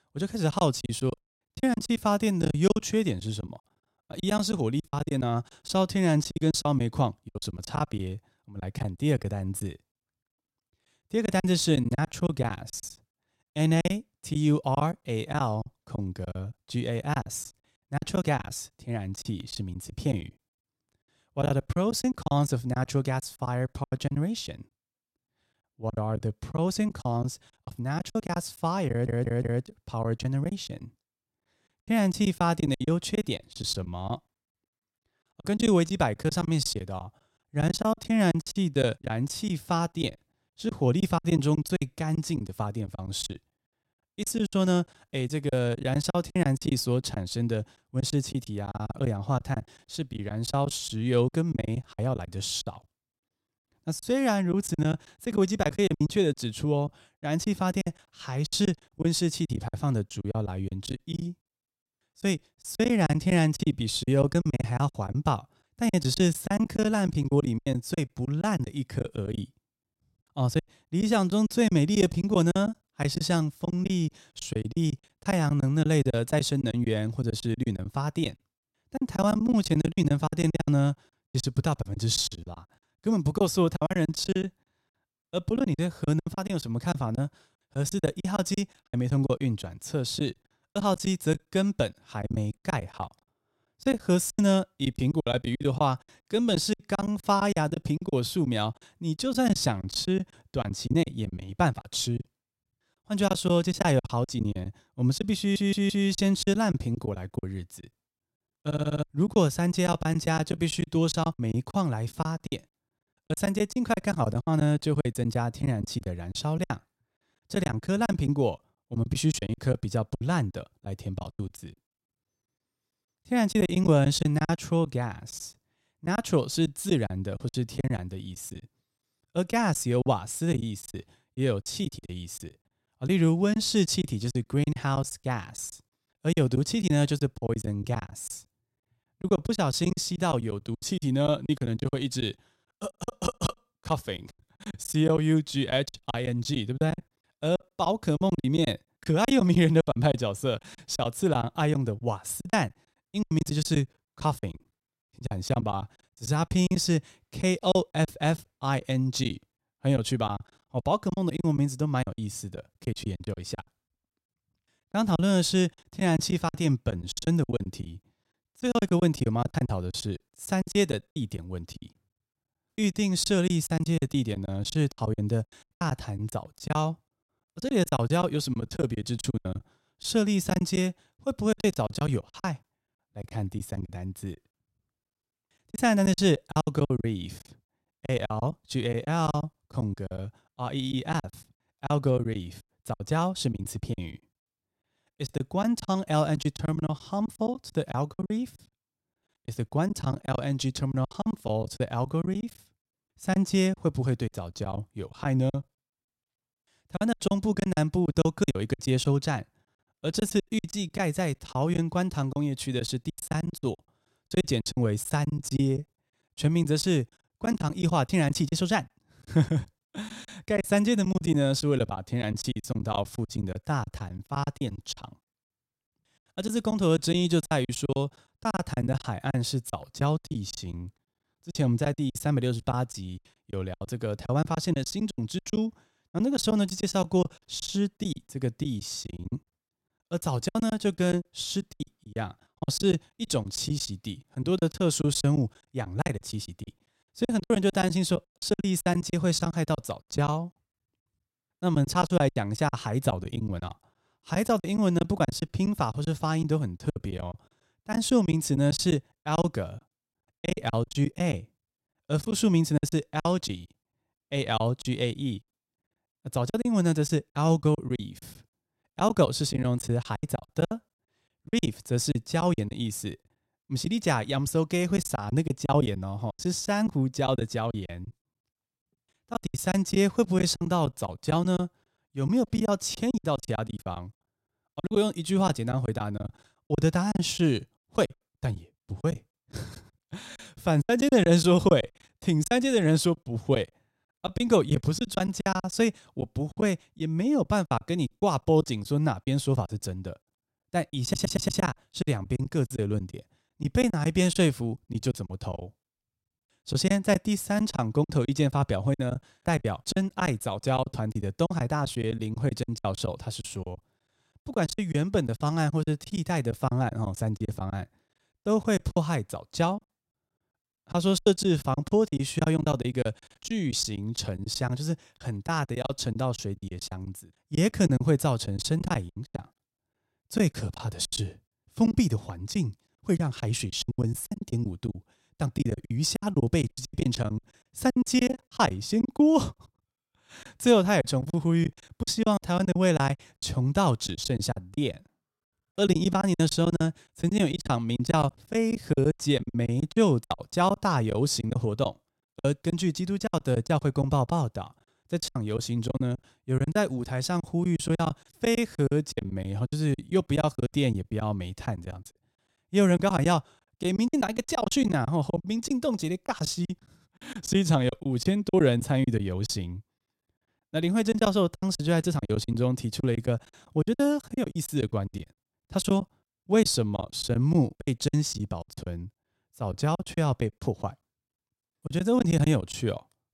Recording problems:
choppy; very; 14% of the speech affected
audio stuttering; 4 times, first at 29 s

